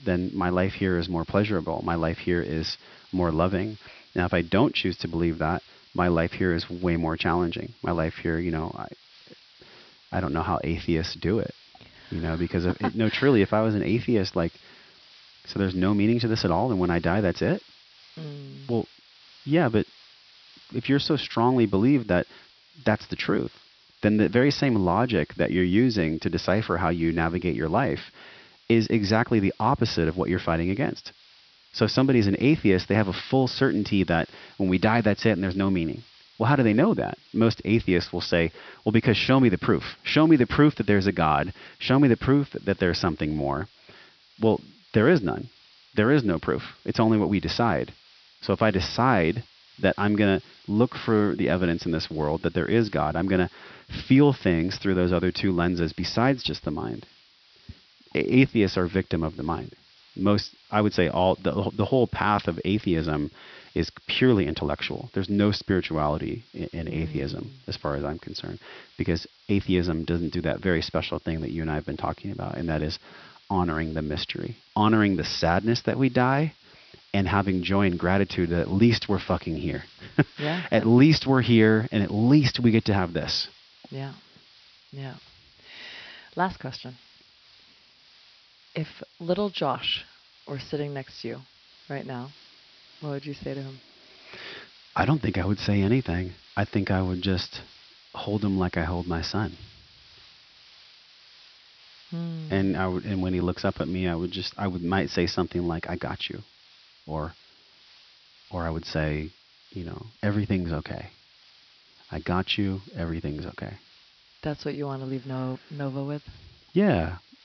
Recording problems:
high frequencies cut off; noticeable; nothing above 5.5 kHz
hiss; faint; throughout; 25 dB below the speech

